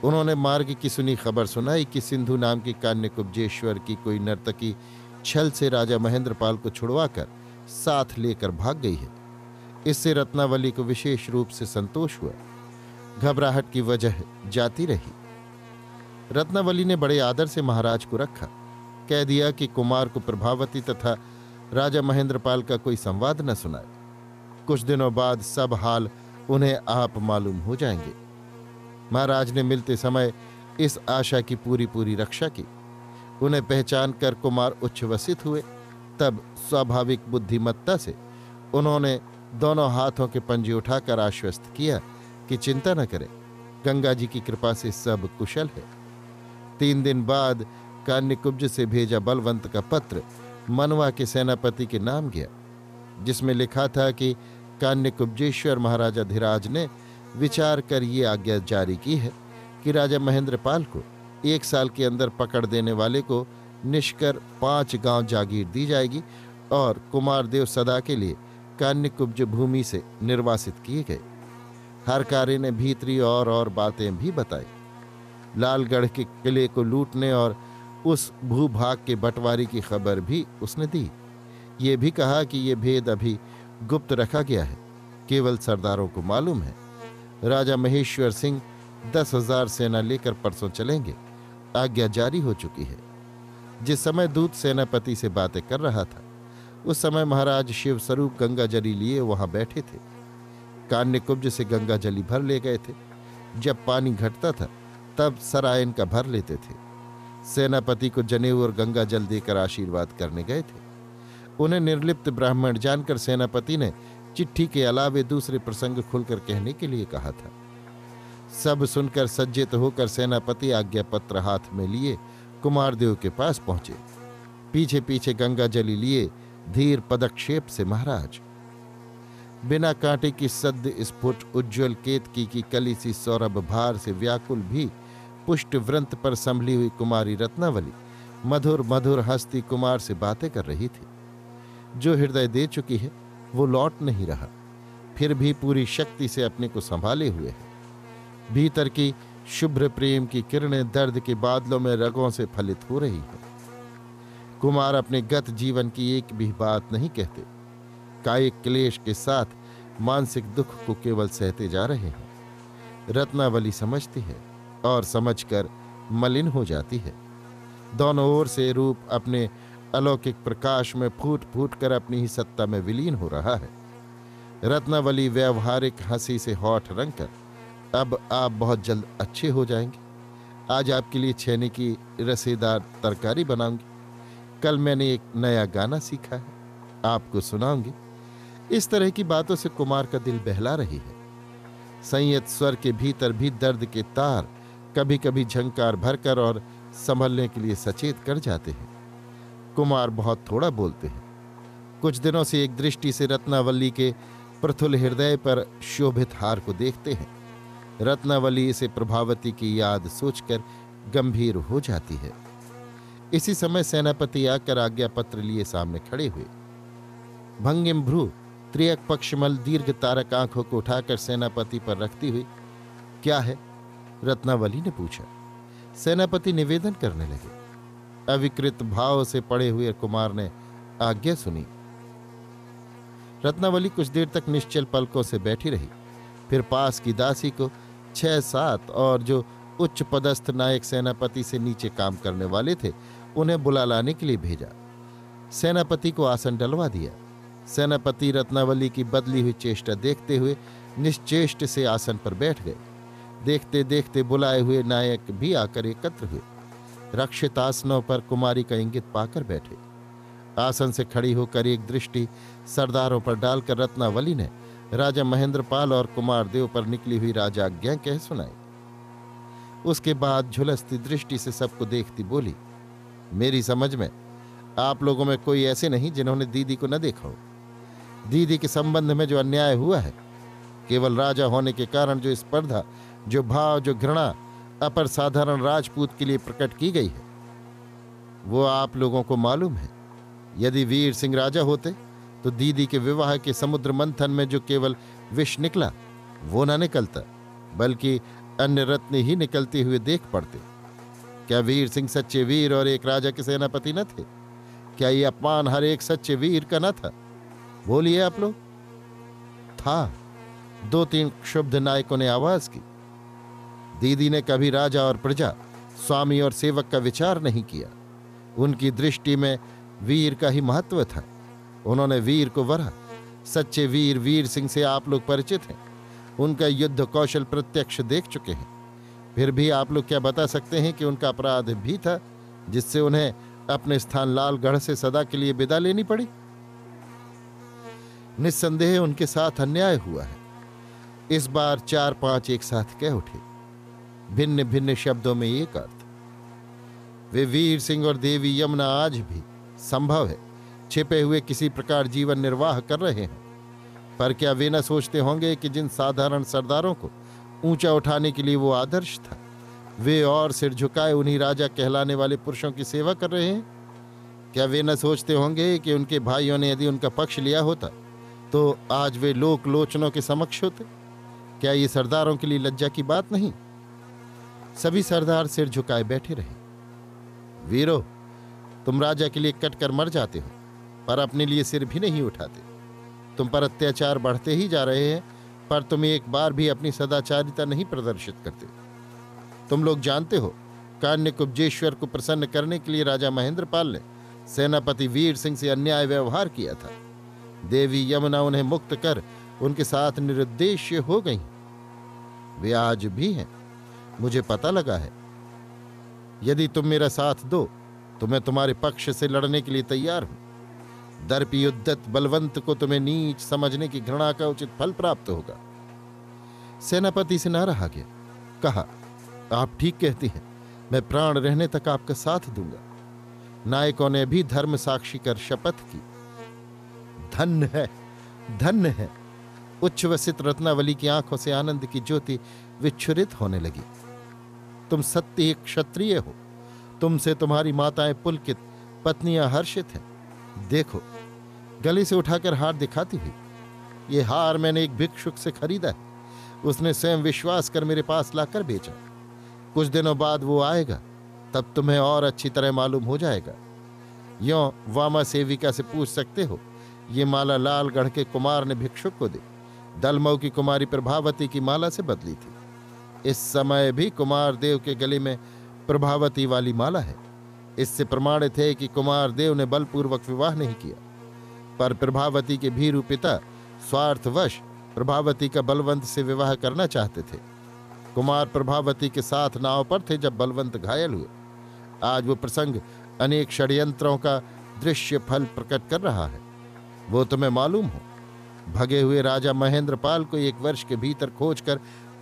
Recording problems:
electrical hum; faint; throughout; 60 Hz, 20 dB below the speech

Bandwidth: 14.5 kHz